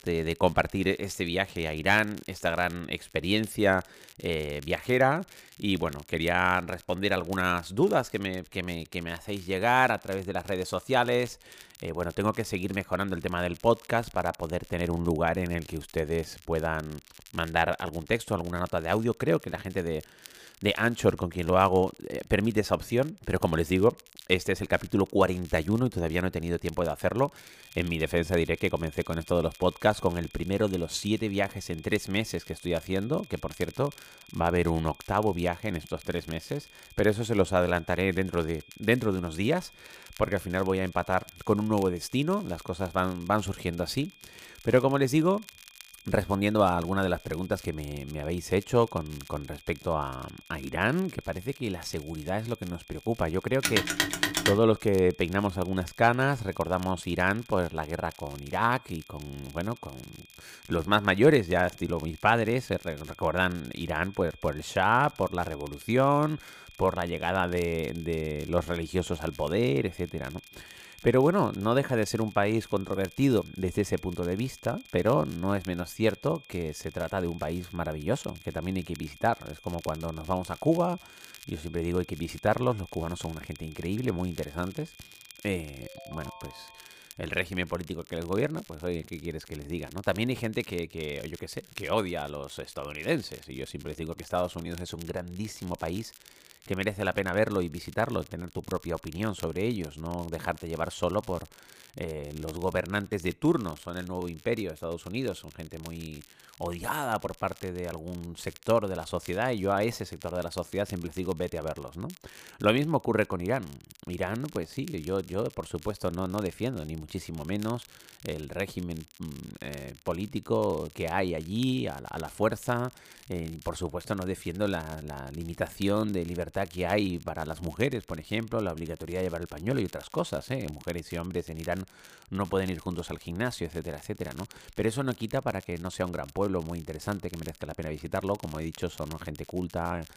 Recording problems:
high-pitched whine; faint; from 28 s to 1:27; 2.5 kHz, 25 dB below the speech
crackle, like an old record; faint; 20 dB below the speech
phone ringing; loud; at 54 s; peak 3 dB above the speech
phone ringing; faint; from 1:26 to 1:27; peak 20 dB below the speech

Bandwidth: 15 kHz